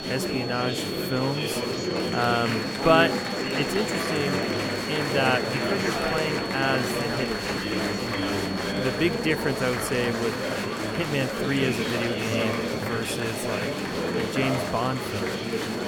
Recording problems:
murmuring crowd; very loud; throughout; as loud as the speech
high-pitched whine; loud; throughout; 4.5 kHz, 9 dB below the speech

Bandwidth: 17 kHz